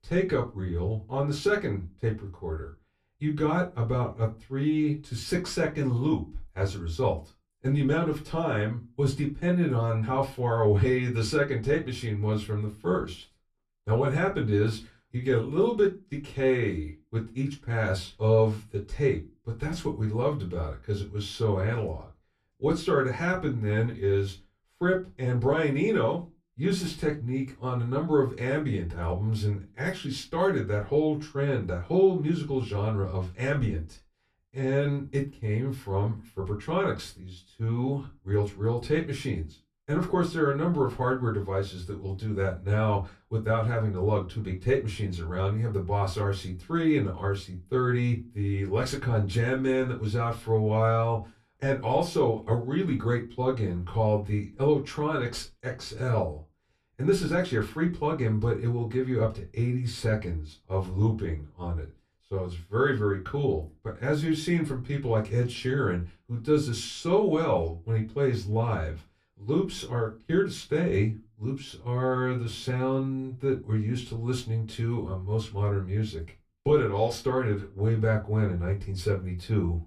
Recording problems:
off-mic speech; far
room echo; very slight; dies away in 0.2 s

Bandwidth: 14 kHz